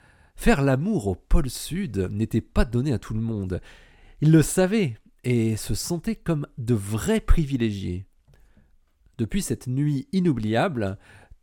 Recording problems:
none

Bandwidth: 17.5 kHz